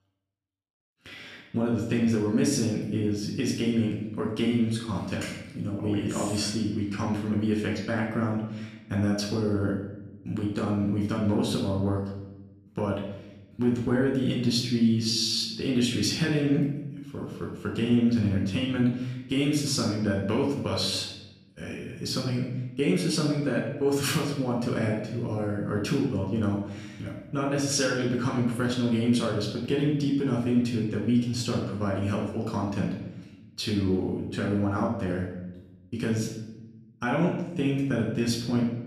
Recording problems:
off-mic speech; far
room echo; noticeable; dies away in 0.9 s

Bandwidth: 15 kHz